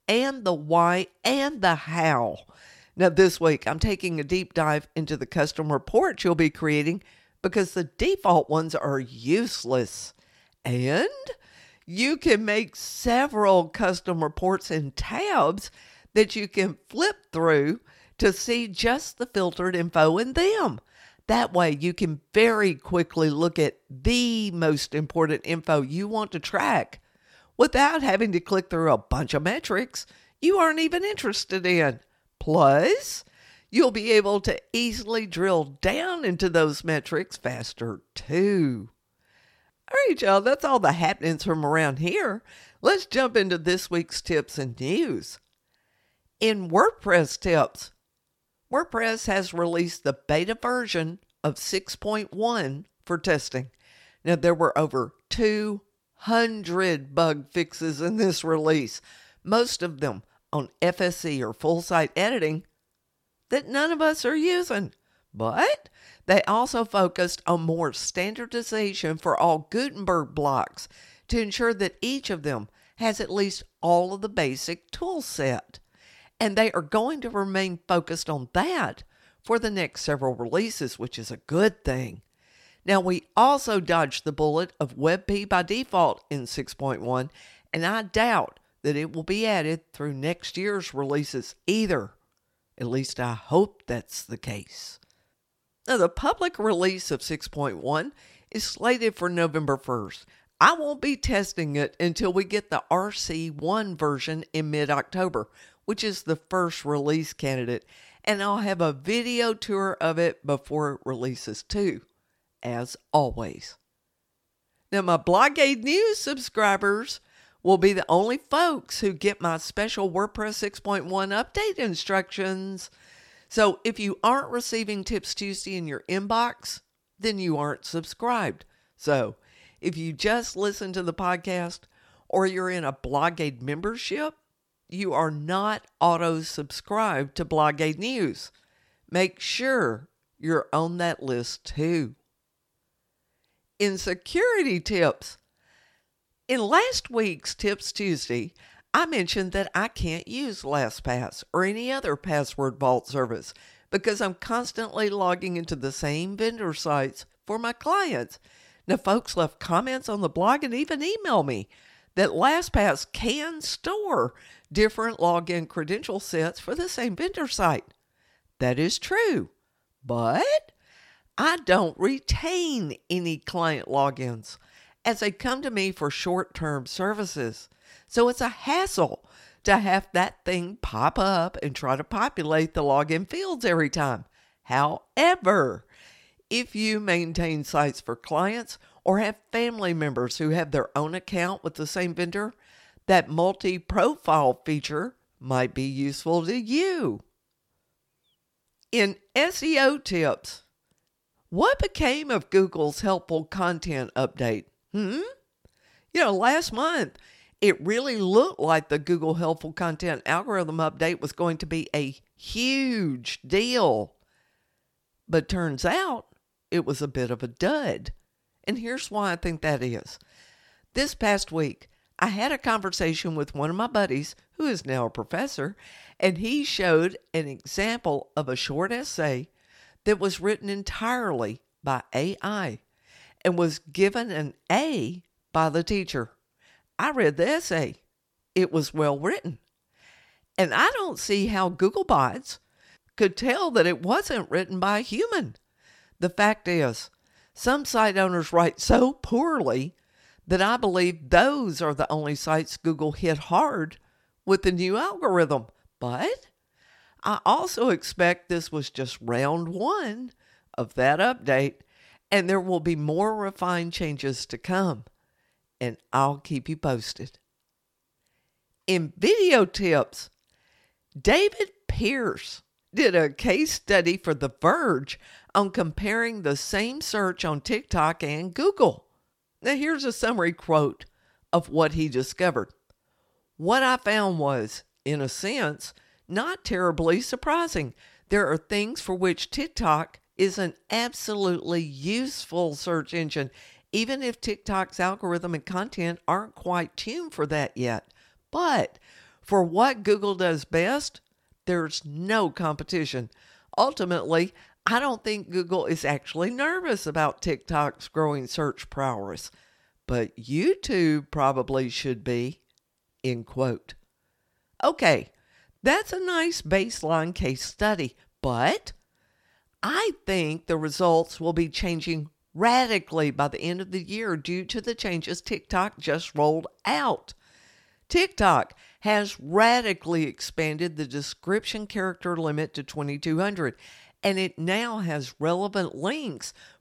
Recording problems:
none

